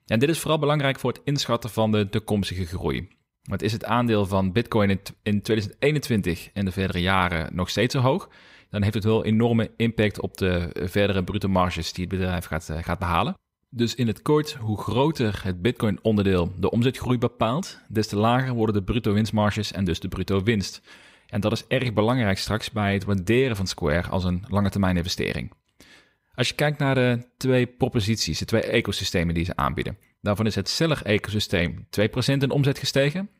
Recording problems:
none

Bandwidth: 15.5 kHz